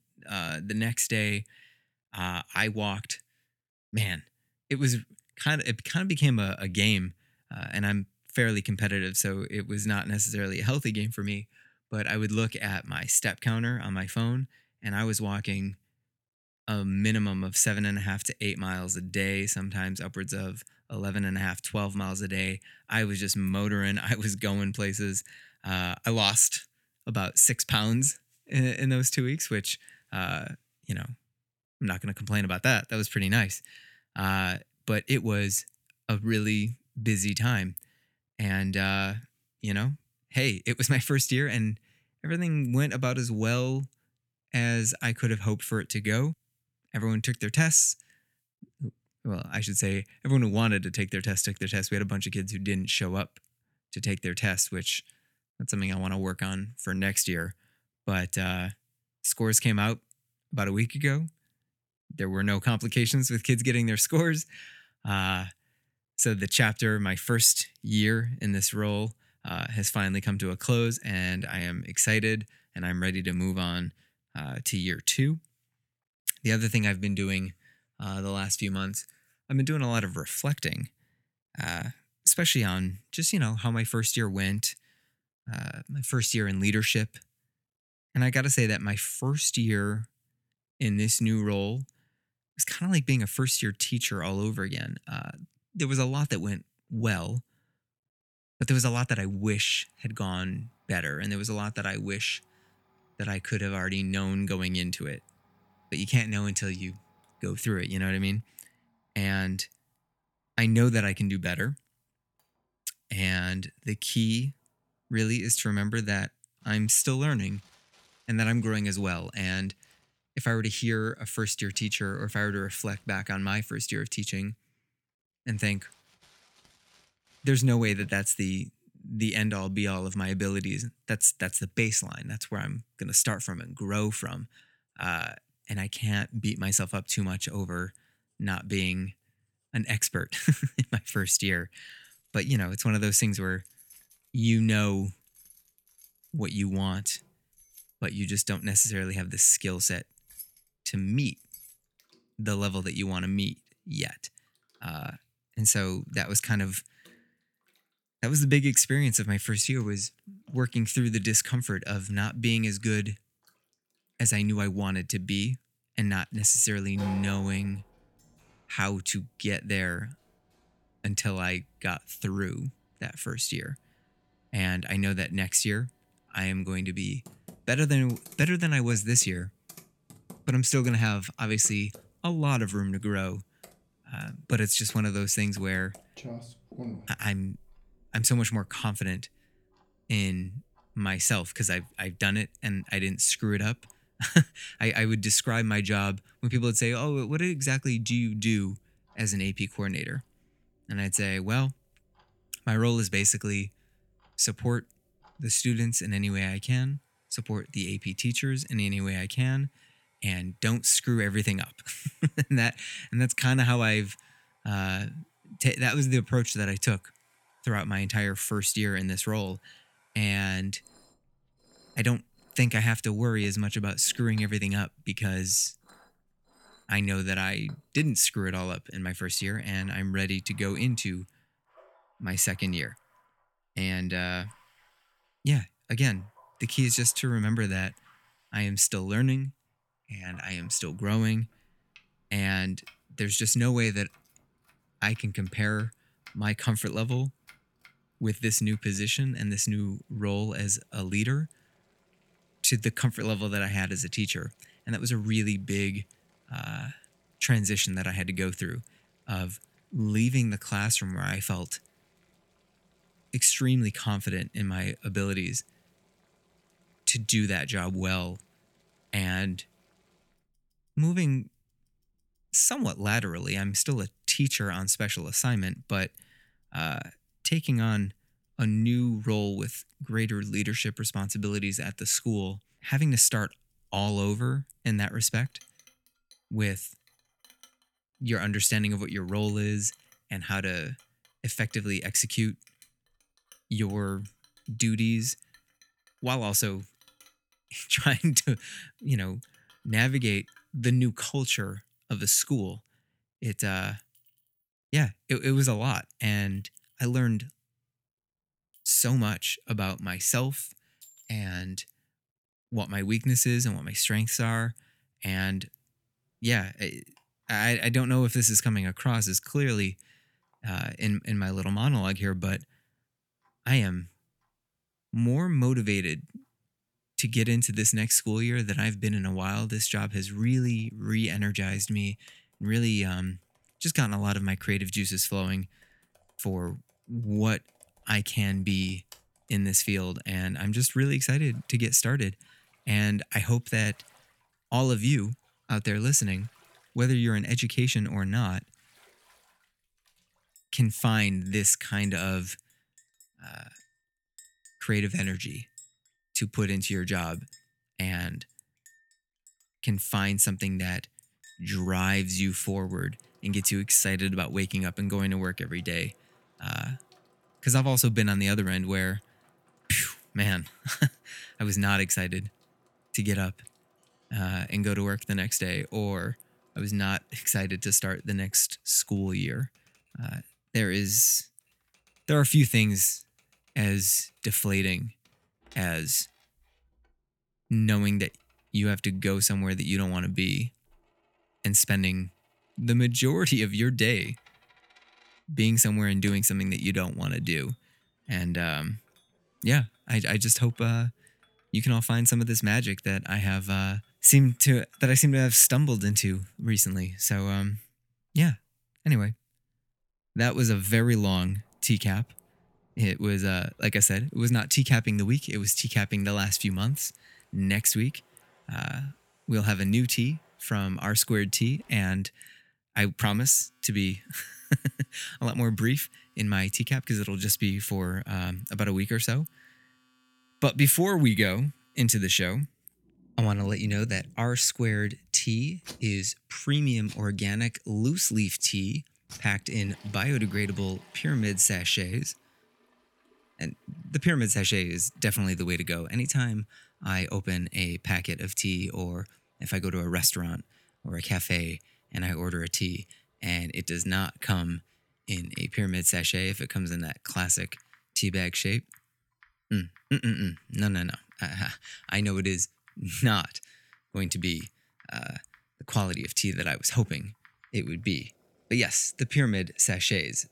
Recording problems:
household noises; faint; from 1:40 on; 30 dB below the speech

